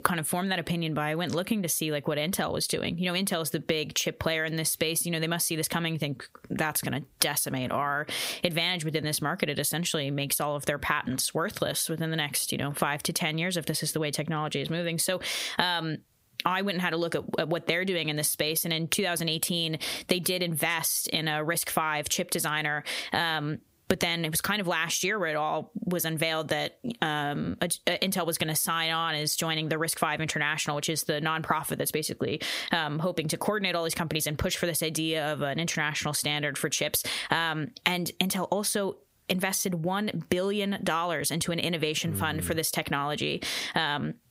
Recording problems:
squashed, flat; heavily

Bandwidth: 15.5 kHz